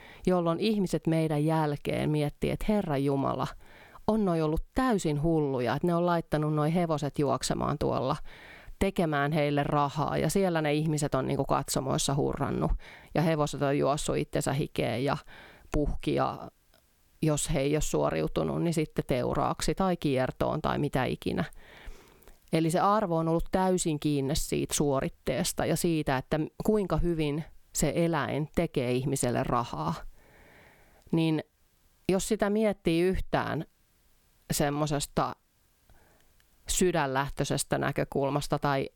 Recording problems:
squashed, flat; somewhat

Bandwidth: 18 kHz